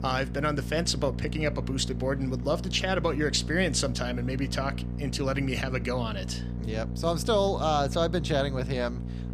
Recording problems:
electrical hum; noticeable; throughout; 60 Hz, 15 dB below the speech
murmuring crowd; faint; throughout; 30 dB below the speech

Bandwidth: 15 kHz